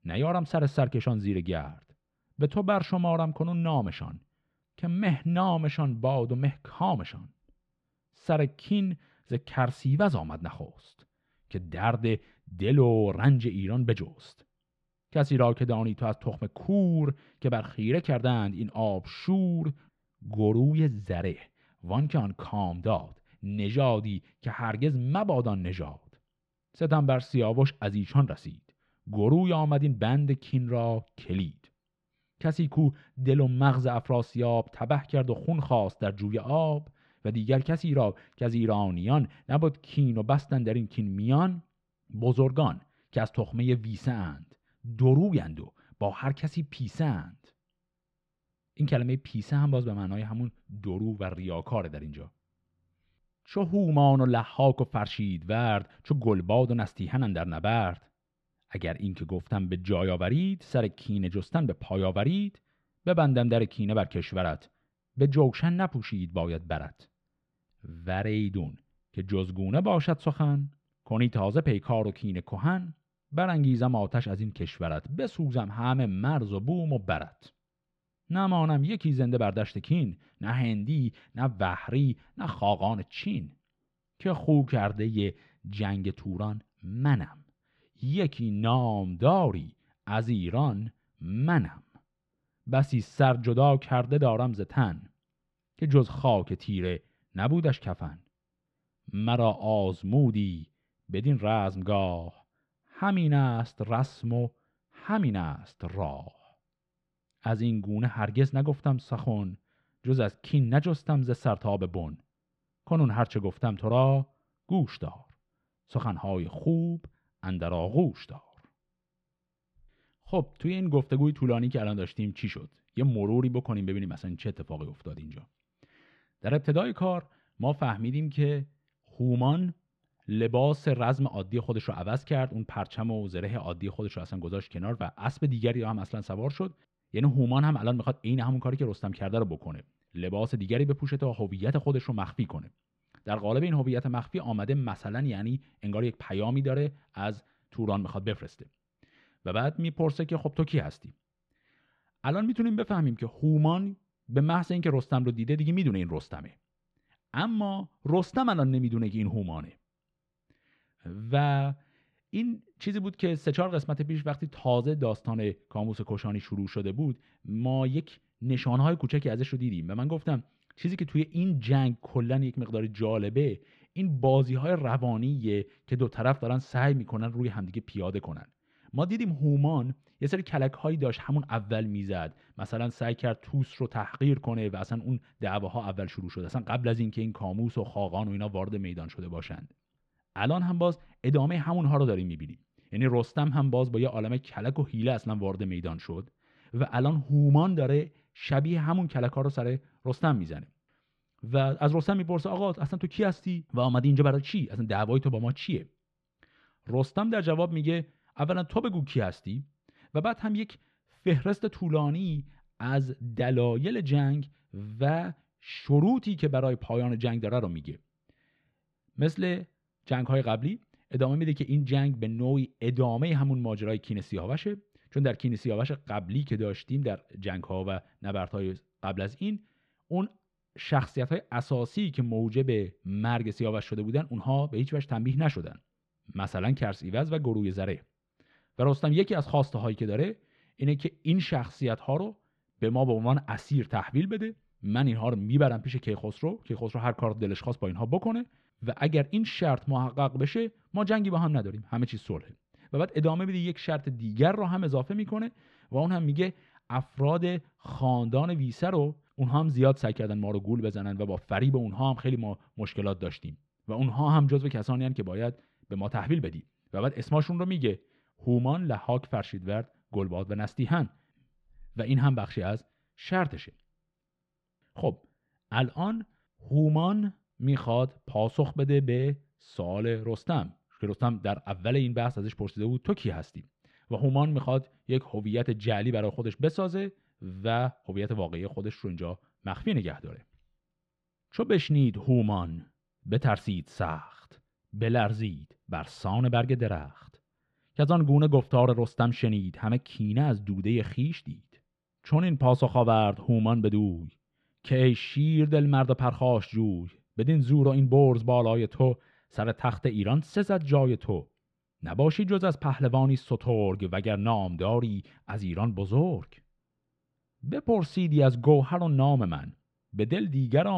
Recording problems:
muffled; slightly; fading above 3 kHz
abrupt cut into speech; at the end

